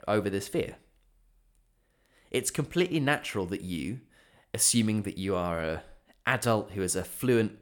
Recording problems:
none

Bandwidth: 18.5 kHz